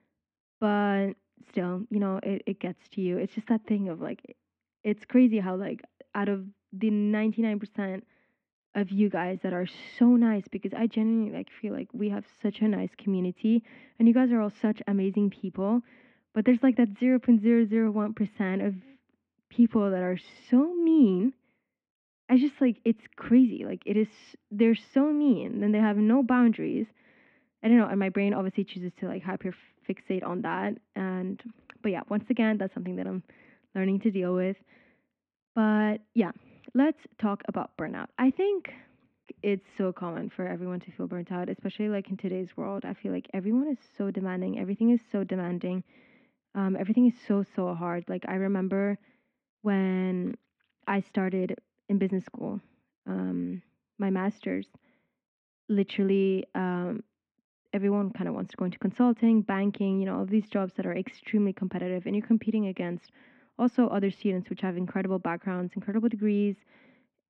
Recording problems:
muffled; very; fading above 2.5 kHz

